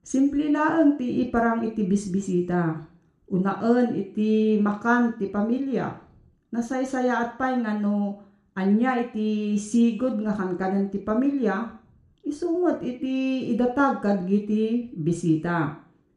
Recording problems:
room echo; slight; dies away in 0.5 s
off-mic speech; somewhat distant

